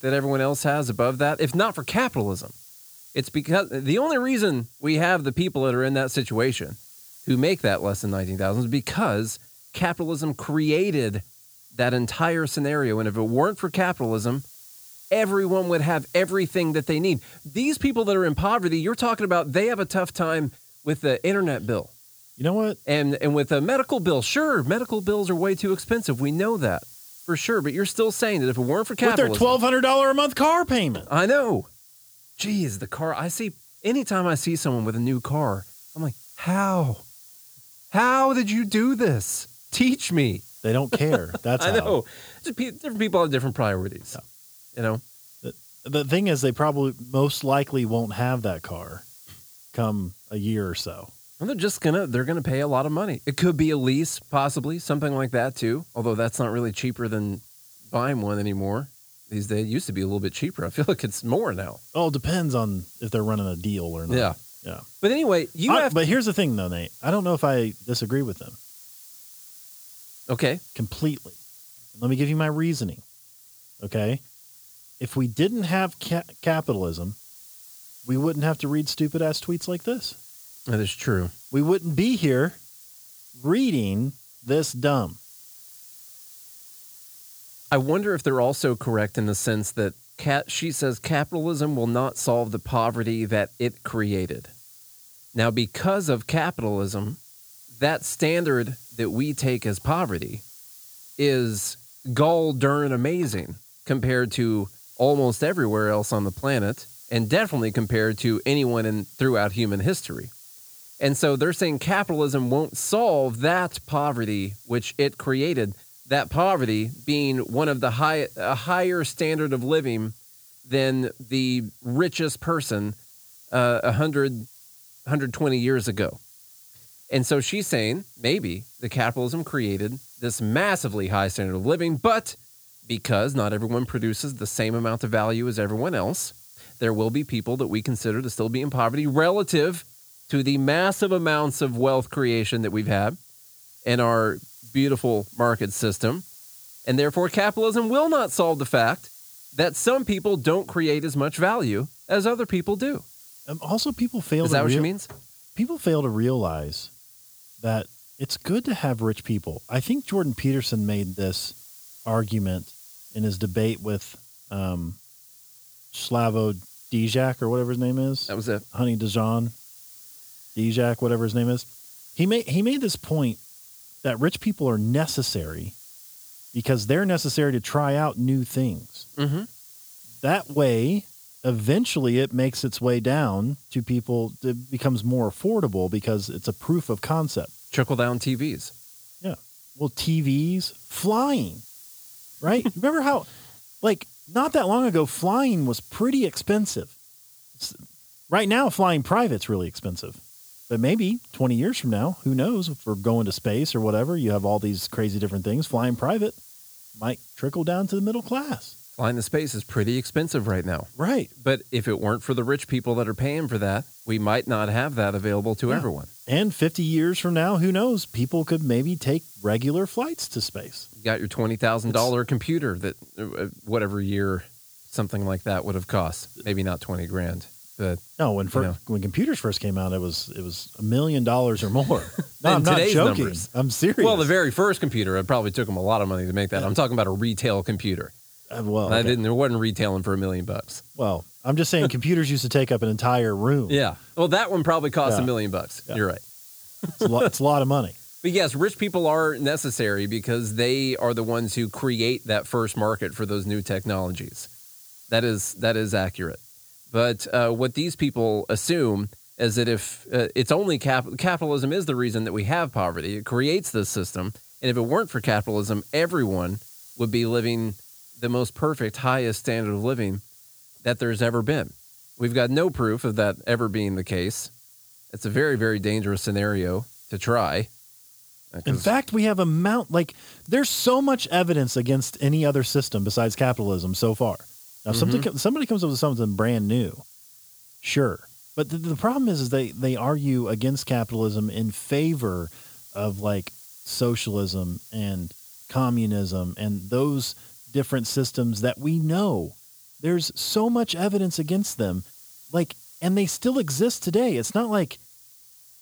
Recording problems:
hiss; faint; throughout; 20 dB below the speech

